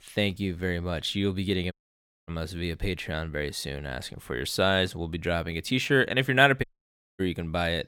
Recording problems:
audio cutting out; at 1.5 s for 0.5 s and at 6.5 s for 0.5 s

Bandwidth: 17 kHz